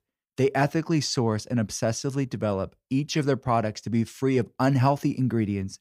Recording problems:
none

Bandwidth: 15.5 kHz